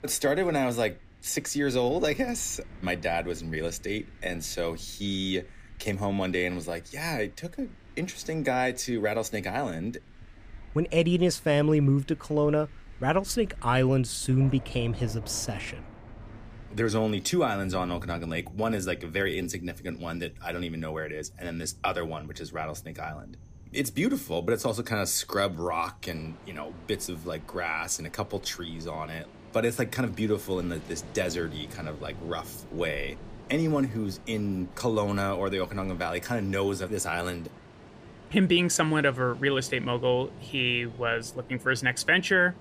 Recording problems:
rain or running water; noticeable; throughout; 20 dB below the speech

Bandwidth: 15 kHz